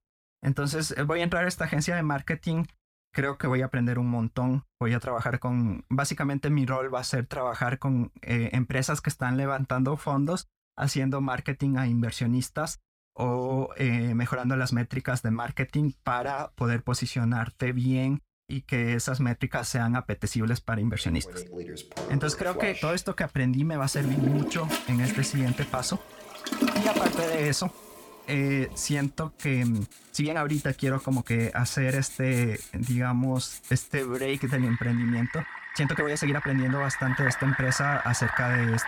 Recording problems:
household noises; loud; from 22 s on; 6 dB below the speech
uneven, jittery; strongly; from 3 to 36 s

